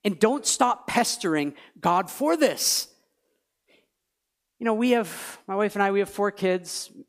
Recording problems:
none

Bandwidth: 15 kHz